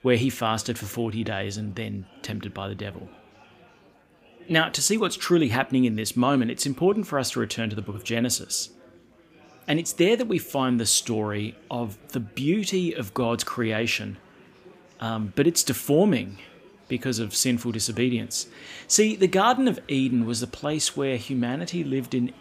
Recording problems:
murmuring crowd; faint; throughout; 25 dB below the speech

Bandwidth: 15 kHz